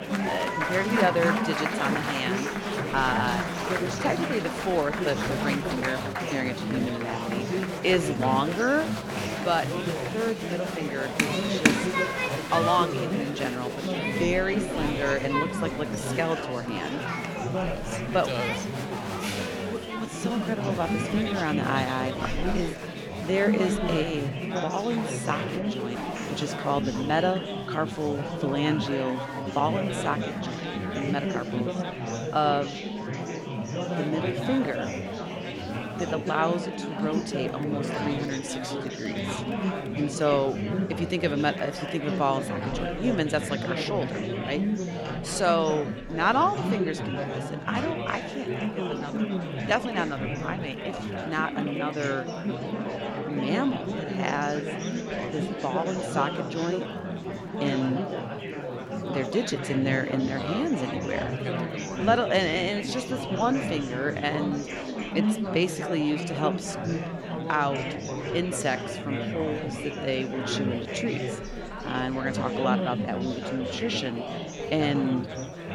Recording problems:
chatter from many people; loud; throughout; 1 dB below the speech

